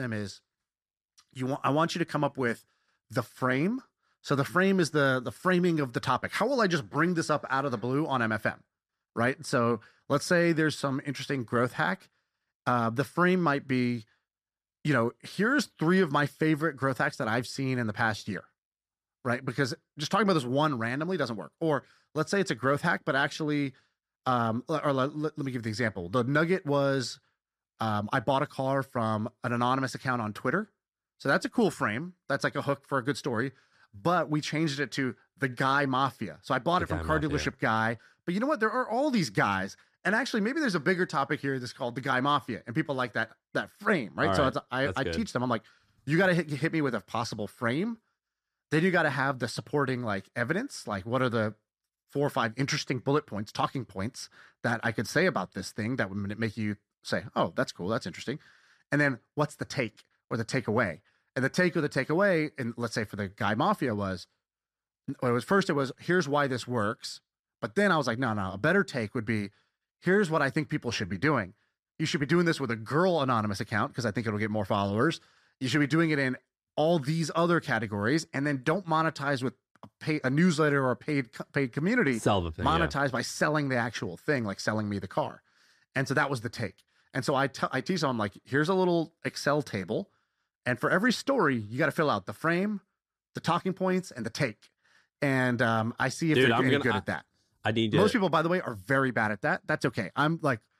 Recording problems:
abrupt cut into speech; at the start

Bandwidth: 14.5 kHz